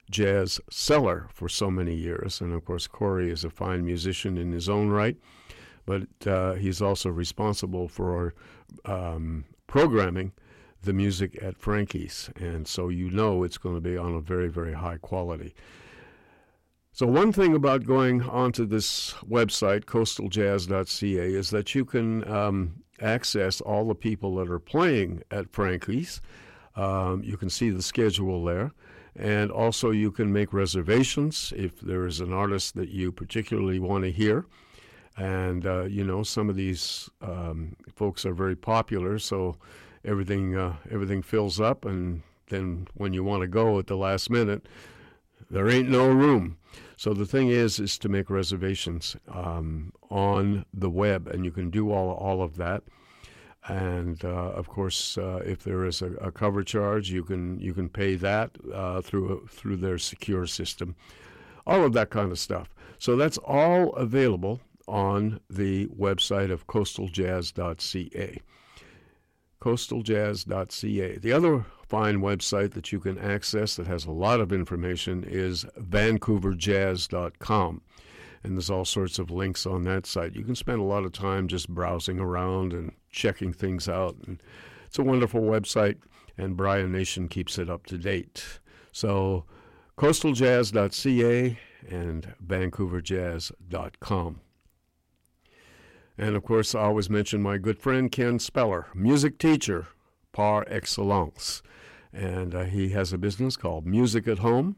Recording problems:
distortion; slight; 10 dB below the speech

